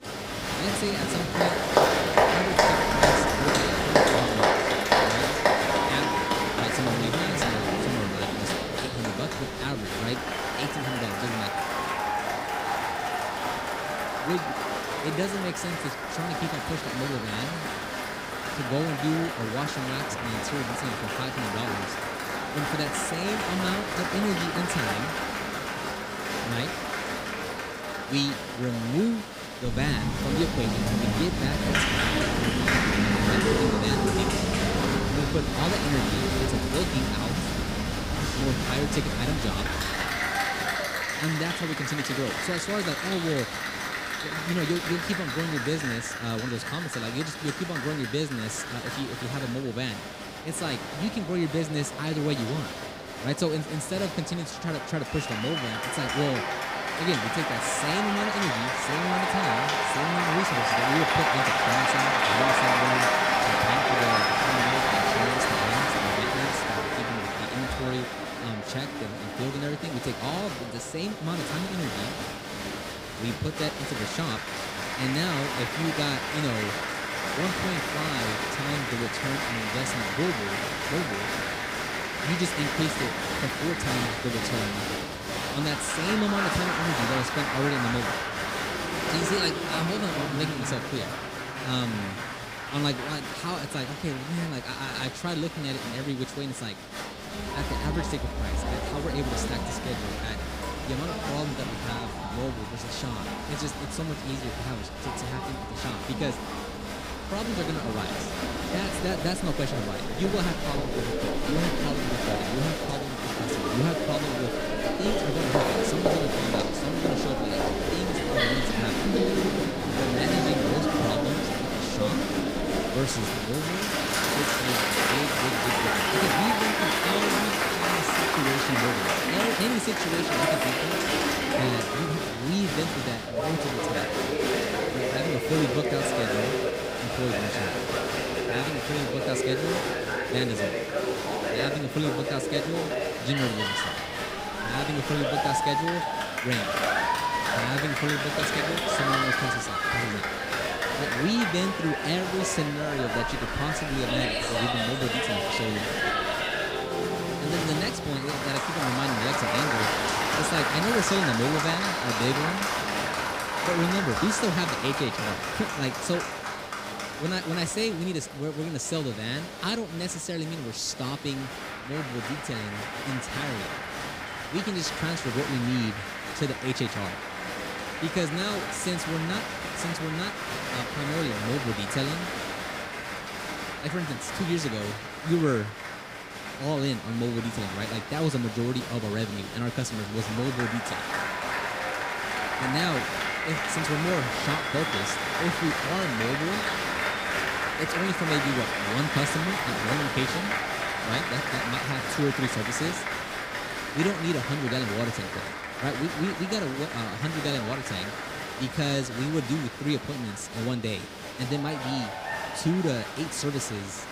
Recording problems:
crowd noise; very loud; throughout; 3 dB above the speech

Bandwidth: 15.5 kHz